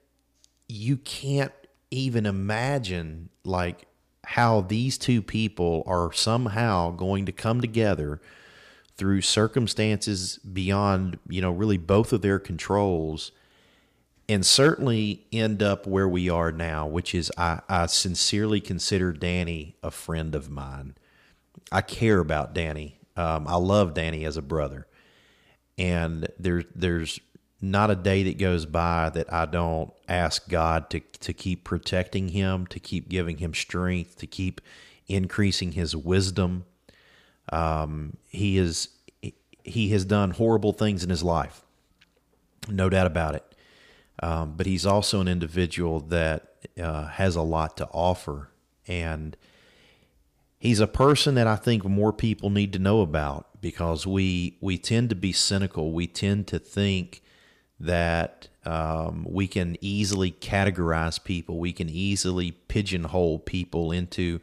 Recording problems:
none

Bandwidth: 15 kHz